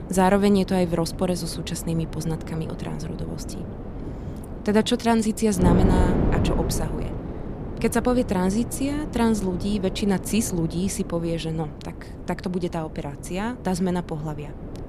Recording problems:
wind noise on the microphone; heavy; 9 dB below the speech

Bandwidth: 14.5 kHz